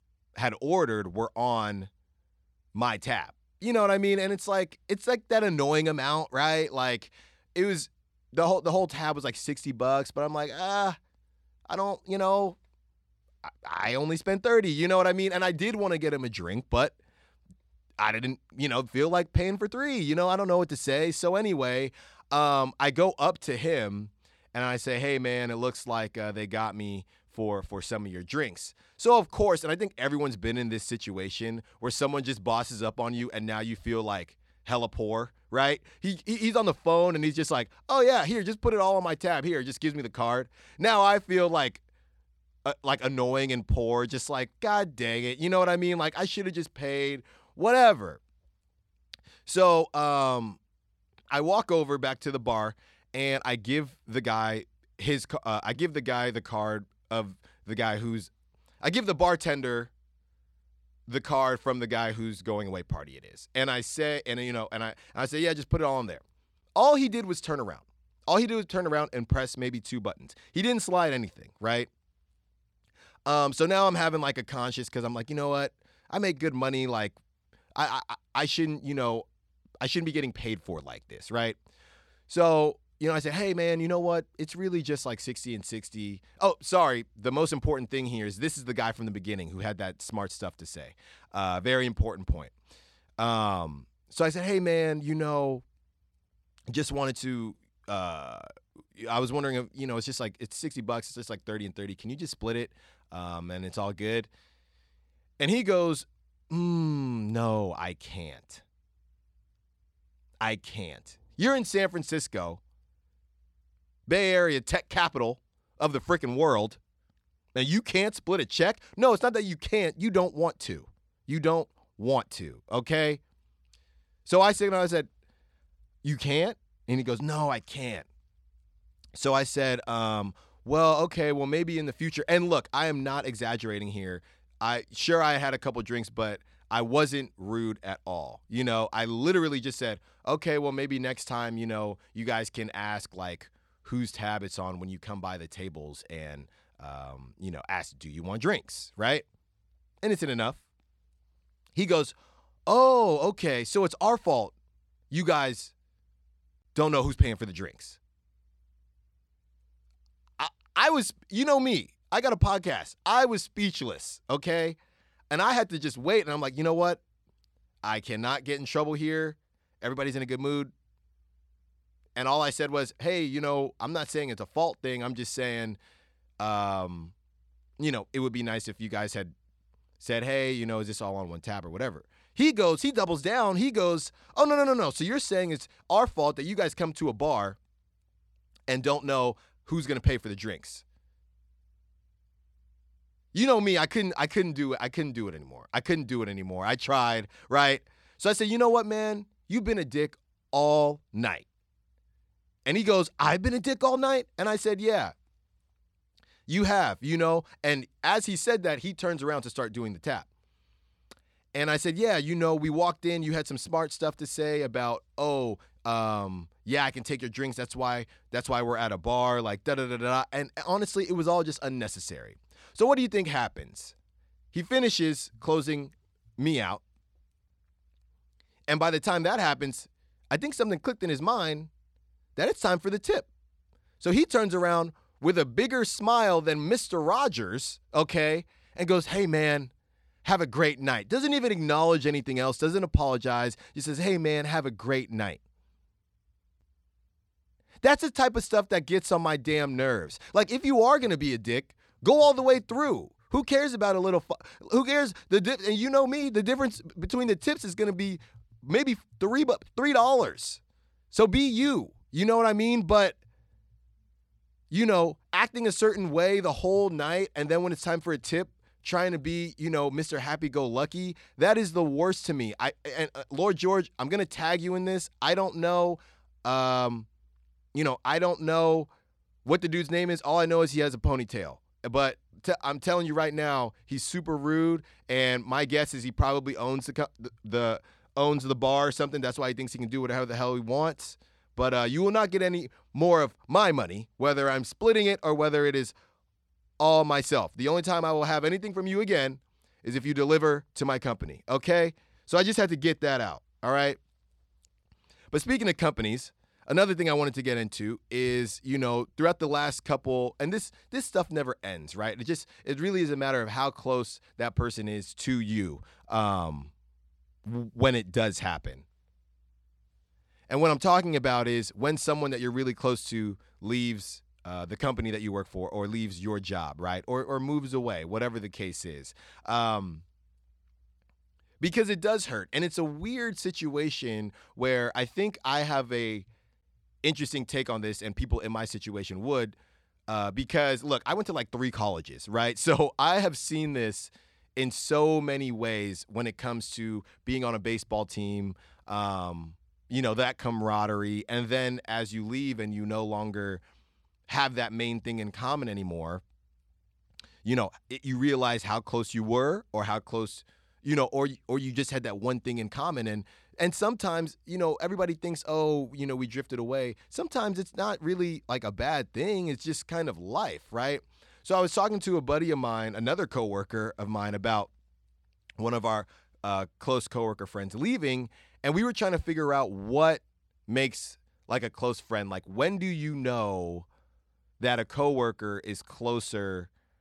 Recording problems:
none

